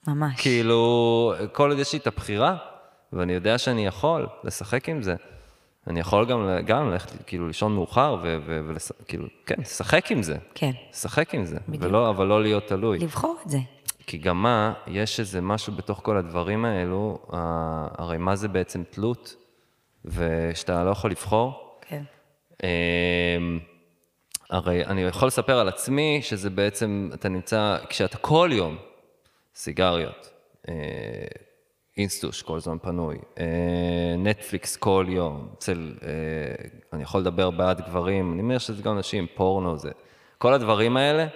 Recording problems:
echo of what is said; faint; throughout; 110 ms later, 20 dB below the speech

